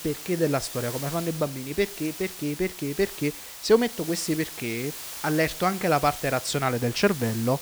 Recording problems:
hiss; loud; throughout; 9 dB below the speech

